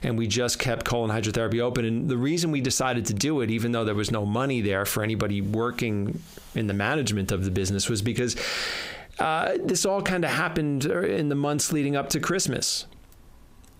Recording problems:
squashed, flat; heavily

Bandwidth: 15.5 kHz